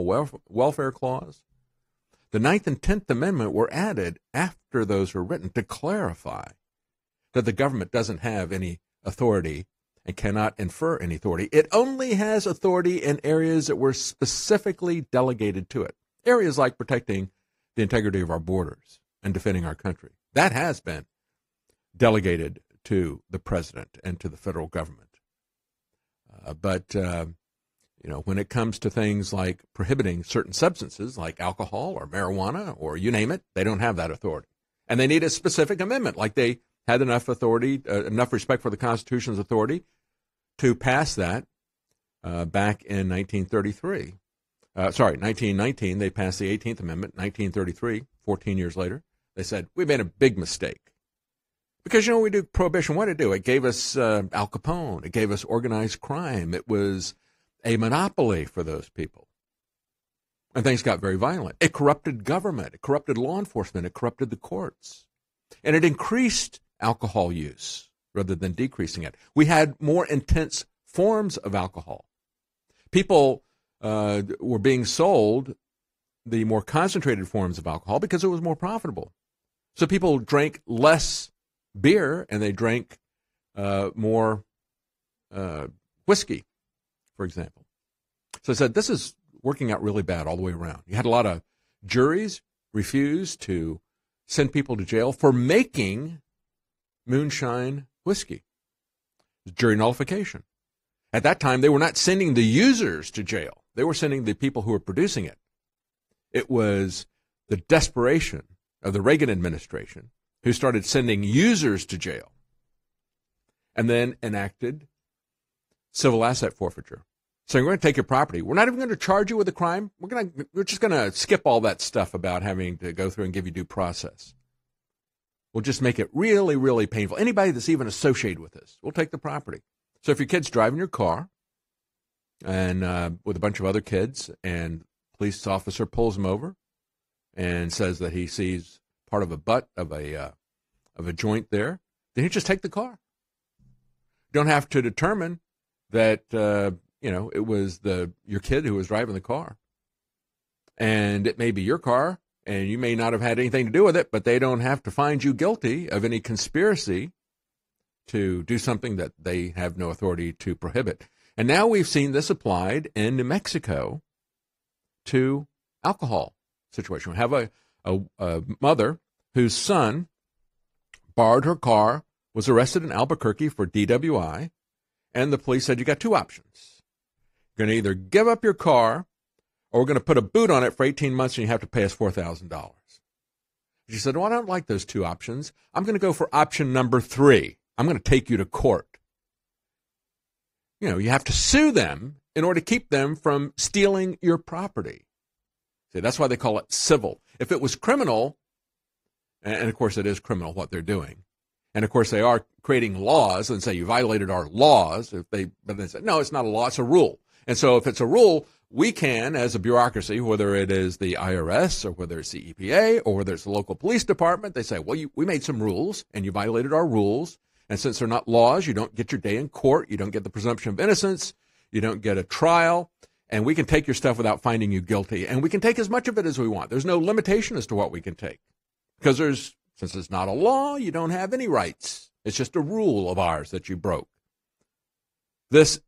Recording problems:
garbled, watery; slightly; nothing above 15.5 kHz
abrupt cut into speech; at the start

